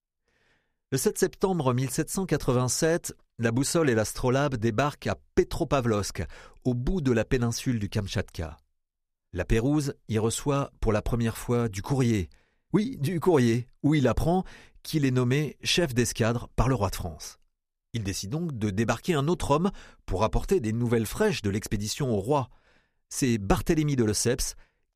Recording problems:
none

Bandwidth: 15 kHz